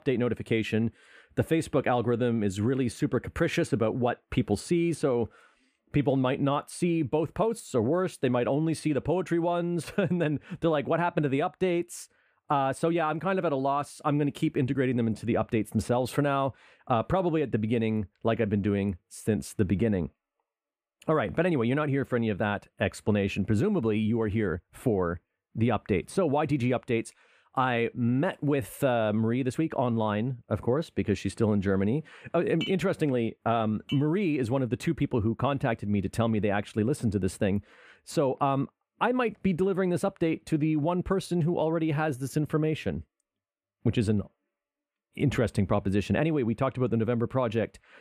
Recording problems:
none

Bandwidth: 15 kHz